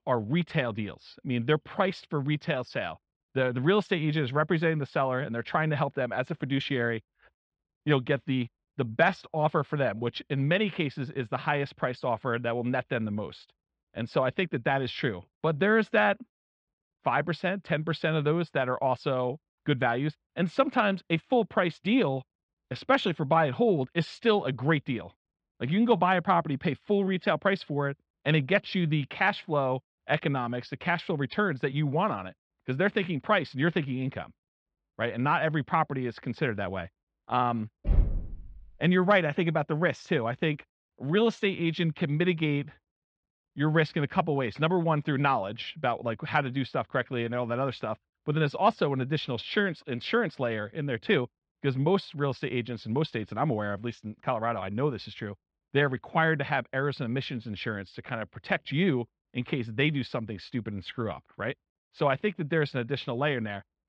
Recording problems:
muffled; very slightly; fading above 4.5 kHz
door banging; loud; at 38 s; peak level with the speech

